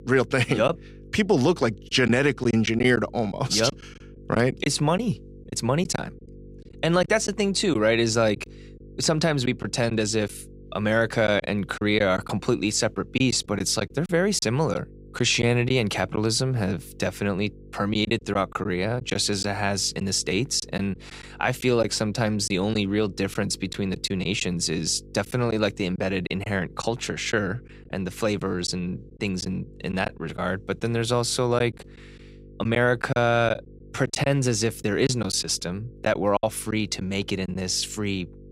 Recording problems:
electrical hum; faint; throughout; 50 Hz, 25 dB below the speech
choppy; occasionally; 5% of the speech affected

